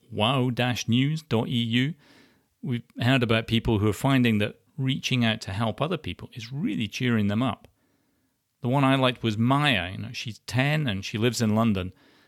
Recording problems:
none

